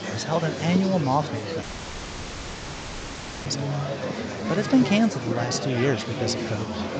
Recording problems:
high frequencies cut off; noticeable; nothing above 8 kHz
murmuring crowd; loud; throughout; 5 dB below the speech
audio cutting out; at 1.5 s for 2 s

